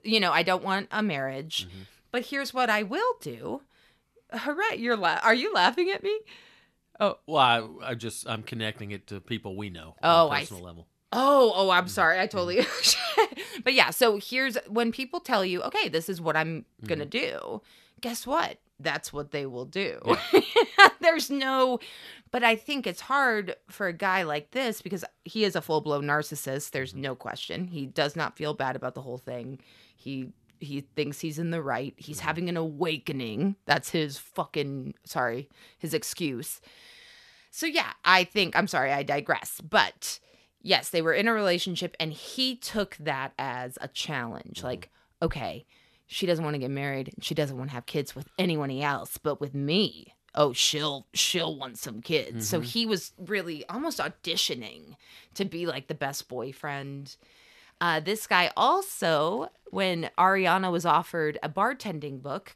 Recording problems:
none

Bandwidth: 13.5 kHz